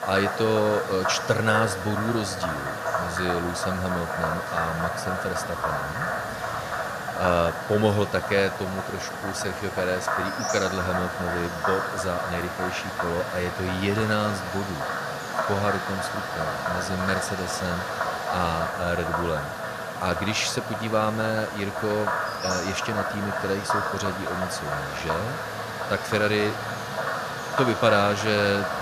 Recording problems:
animal sounds; loud; throughout; 2 dB below the speech
alarms or sirens; very faint; throughout; 30 dB below the speech

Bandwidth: 14.5 kHz